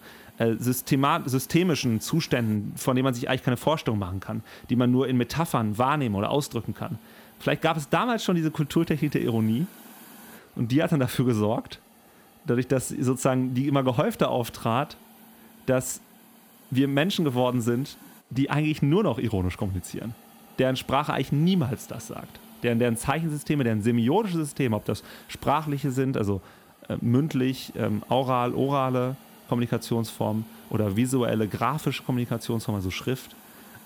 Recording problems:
hiss; faint; throughout; 25 dB below the speech

